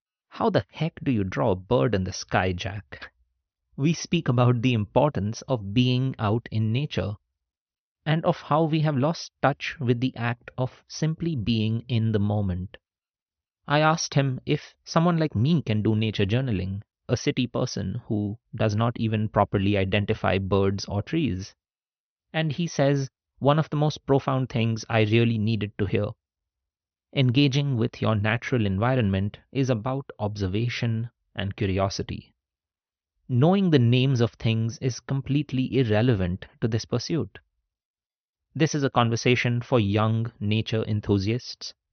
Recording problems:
high frequencies cut off; noticeable; nothing above 6 kHz

